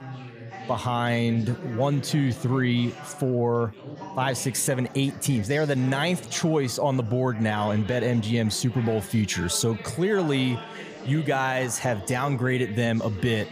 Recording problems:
chatter from many people; noticeable; throughout; 15 dB below the speech

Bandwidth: 15 kHz